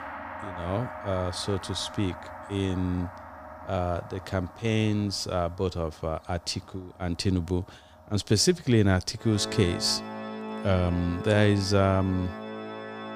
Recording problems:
background music; noticeable; throughout; 10 dB below the speech

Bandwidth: 15 kHz